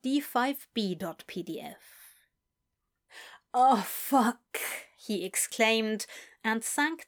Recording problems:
none

